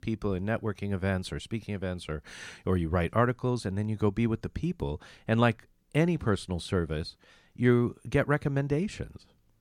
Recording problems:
none

